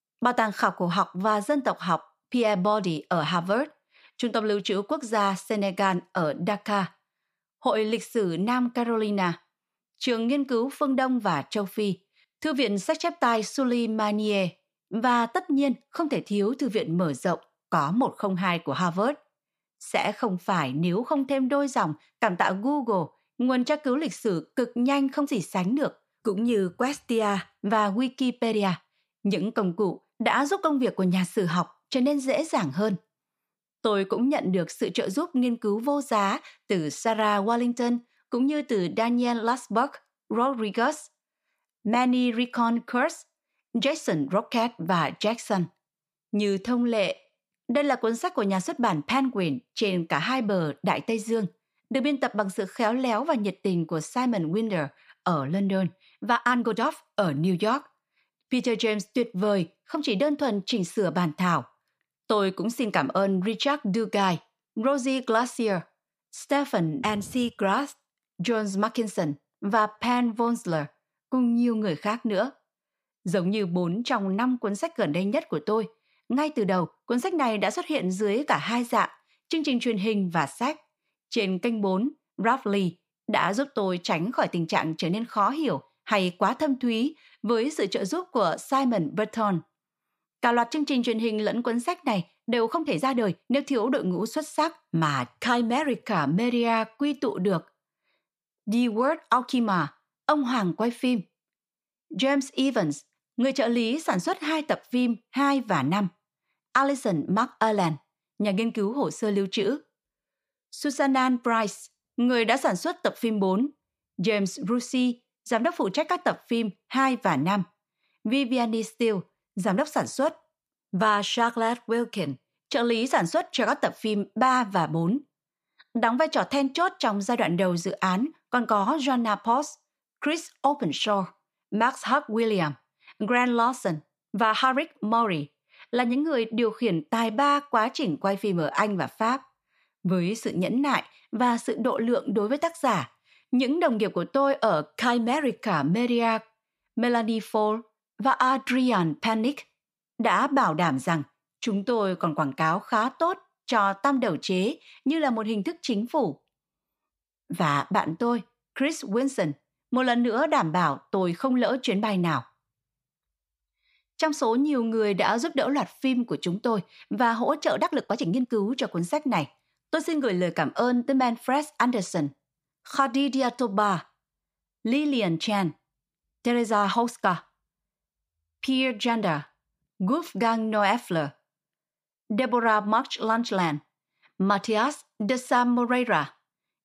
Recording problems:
uneven, jittery; strongly; from 24 s to 3:06

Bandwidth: 15 kHz